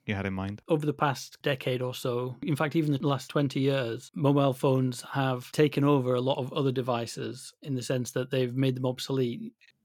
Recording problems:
none

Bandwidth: 17.5 kHz